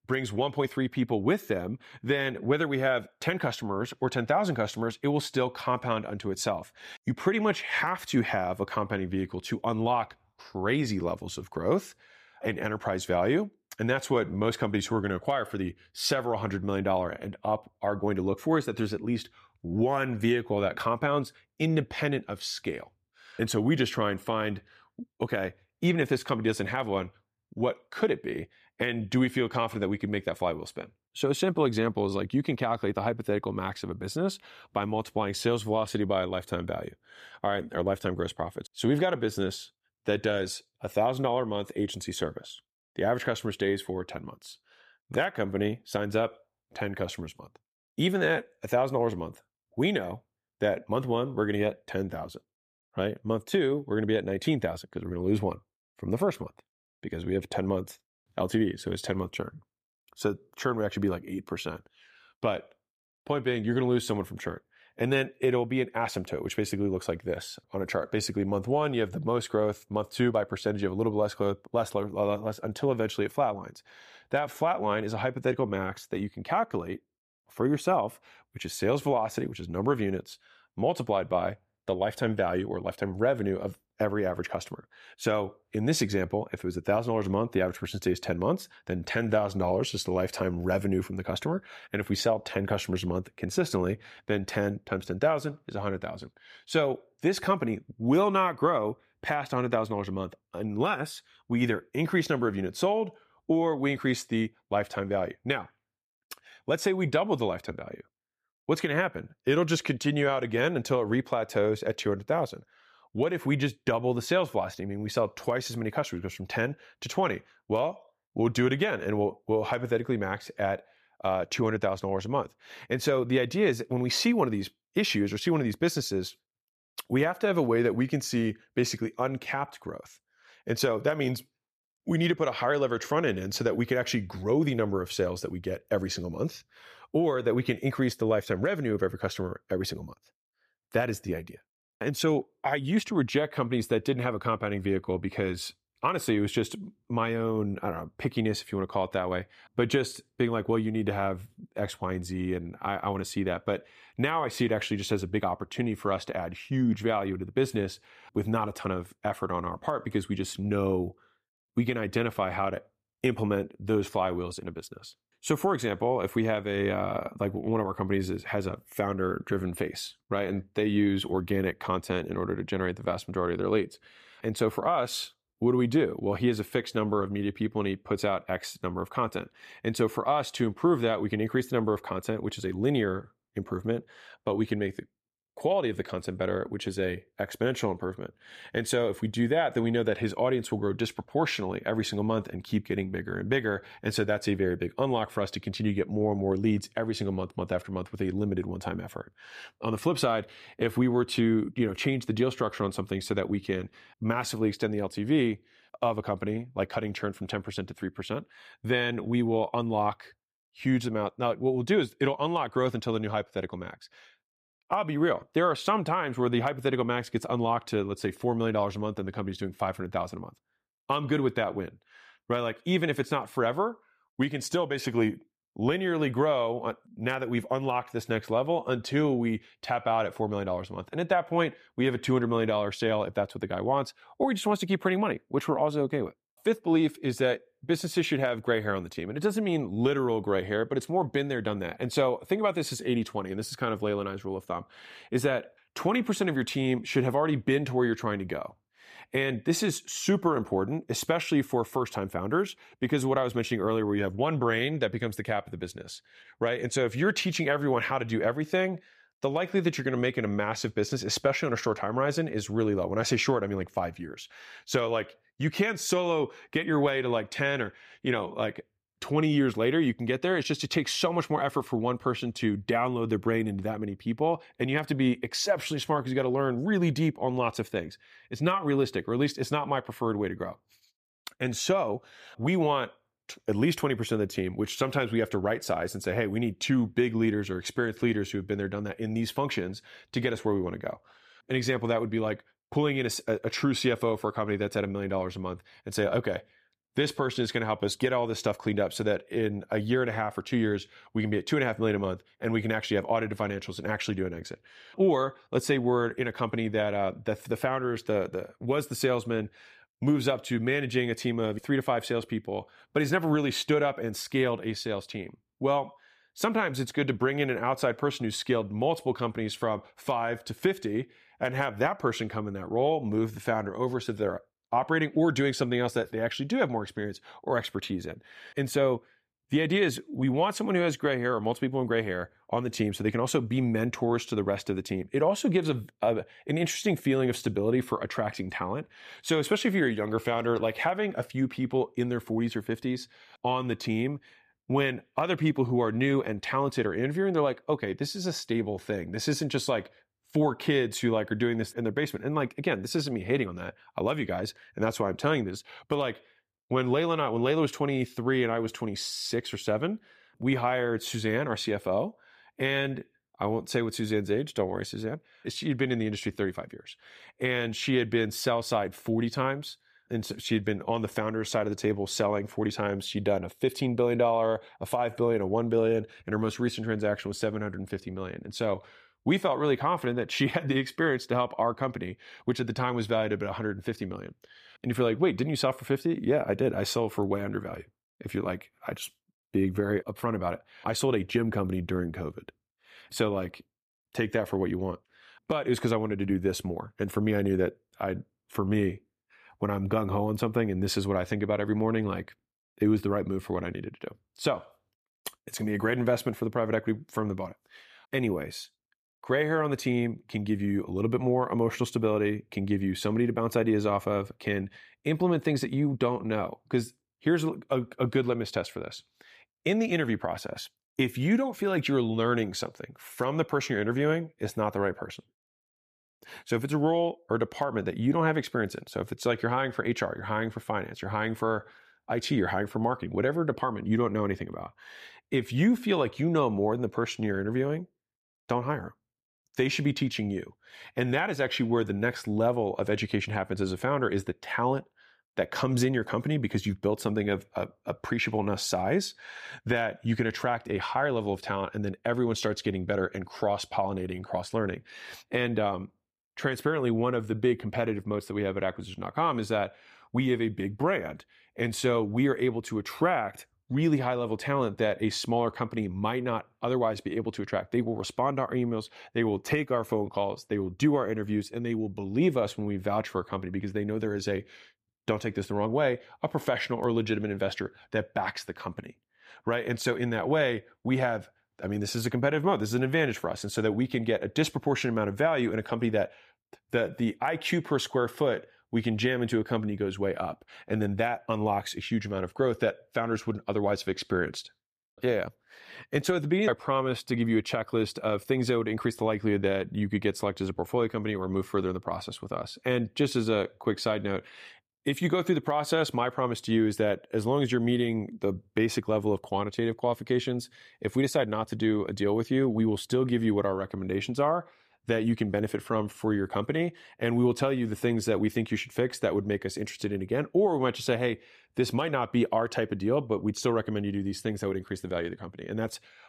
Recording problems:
none

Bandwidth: 14.5 kHz